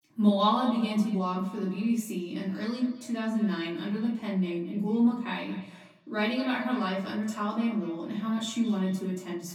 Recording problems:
off-mic speech; far
echo of what is said; faint; throughout; 220 ms later, 20 dB below the speech
room echo; slight; dies away in 0.5 s

